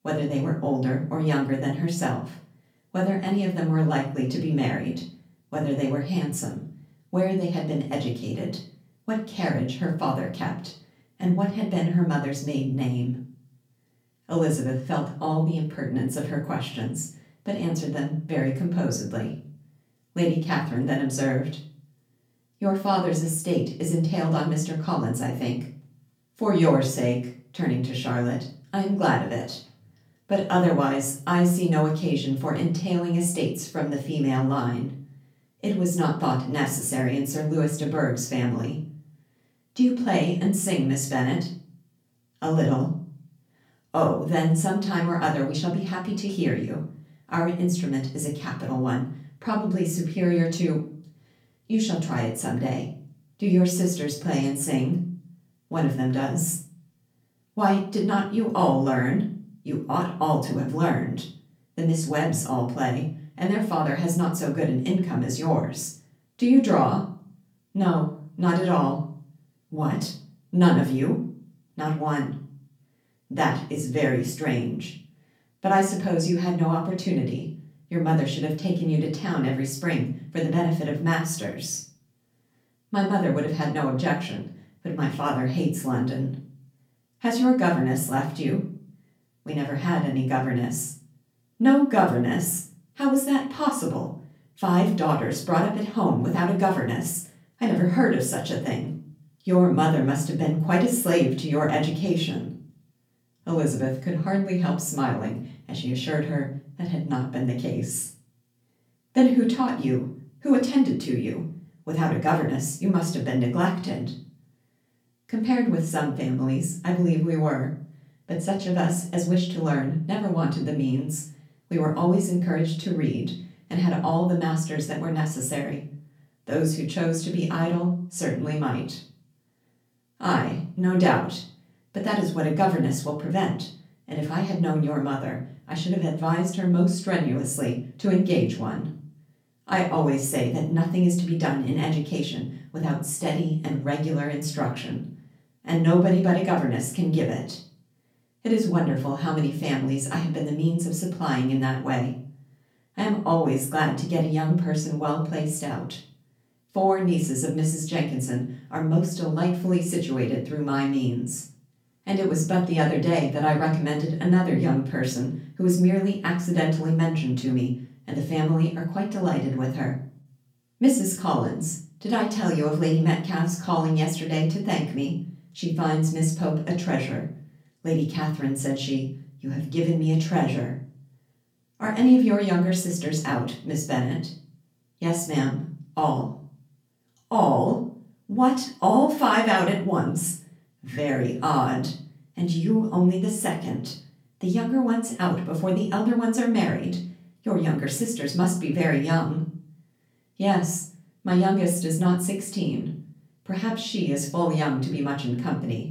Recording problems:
off-mic speech; far
room echo; slight; dies away in 0.4 s

